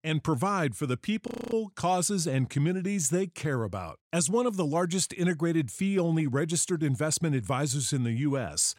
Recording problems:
audio freezing; at 1.5 s

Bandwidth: 16 kHz